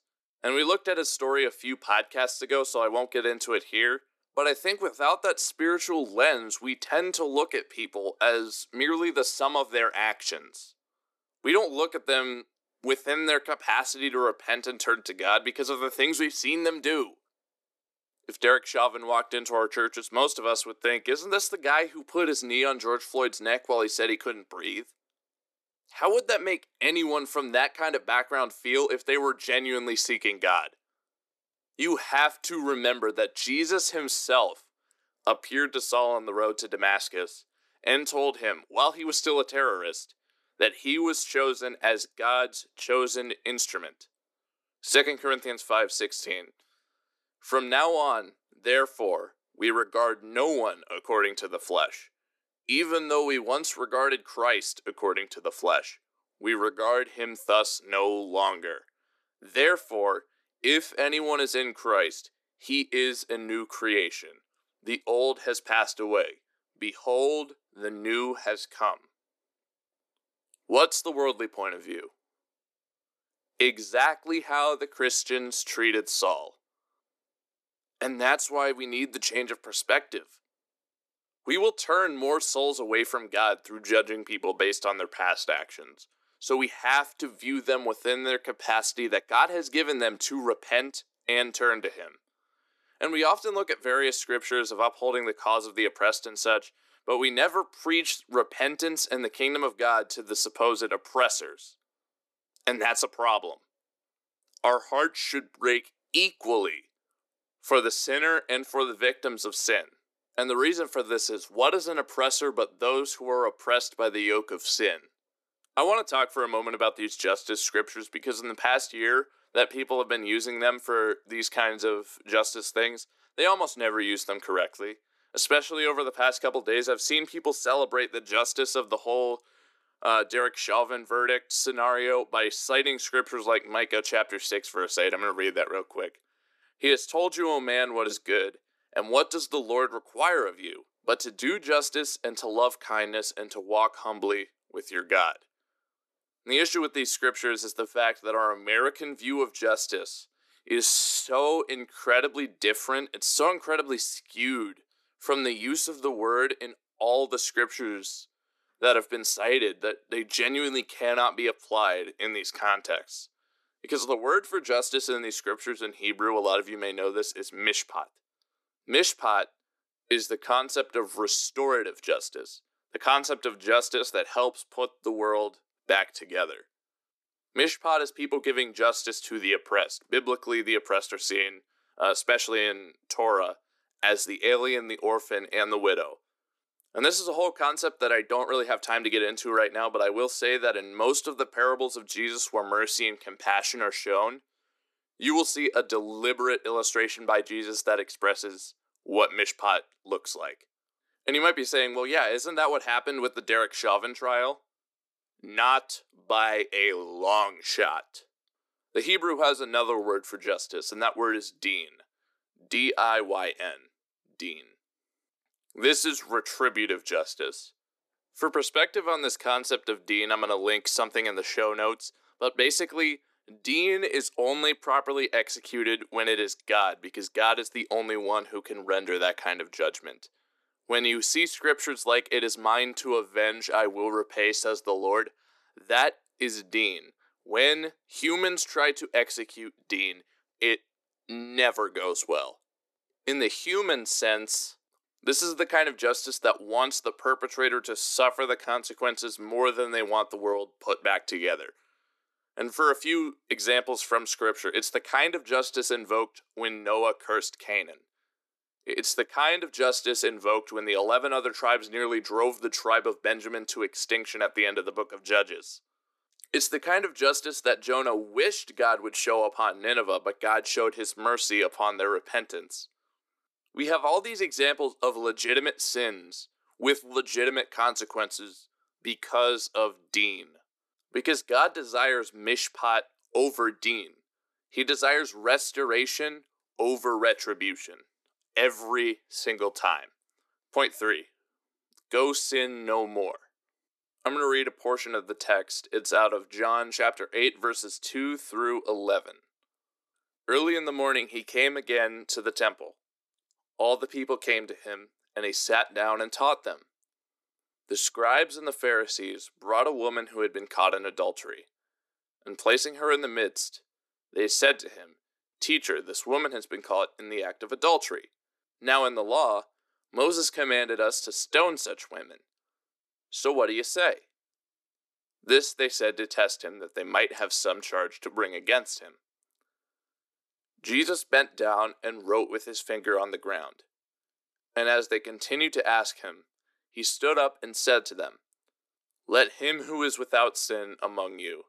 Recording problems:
thin; somewhat; fading below 300 Hz

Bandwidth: 13.5 kHz